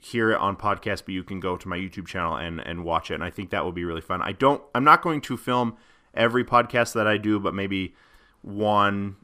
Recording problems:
none

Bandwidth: 15 kHz